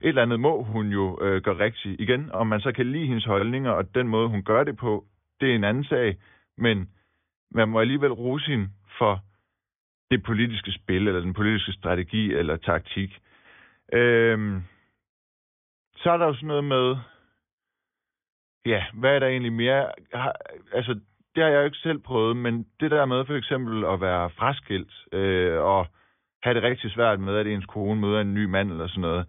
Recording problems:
high frequencies cut off; severe; nothing above 3.5 kHz

